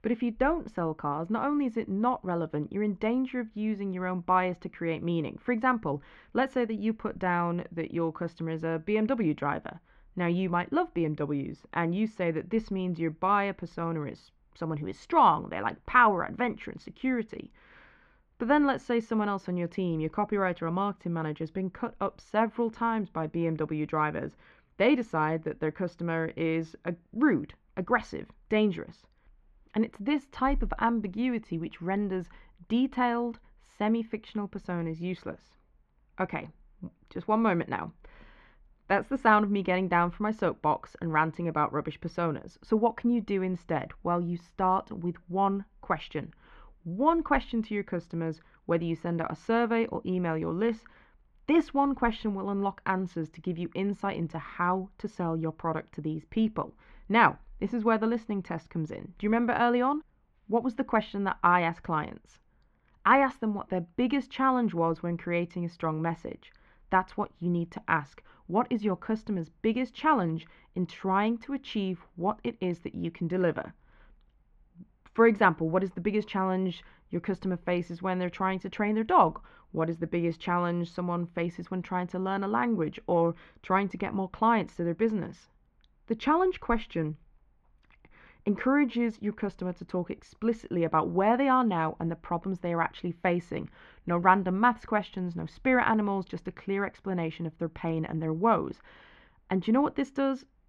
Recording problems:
muffled; very; fading above 2 kHz

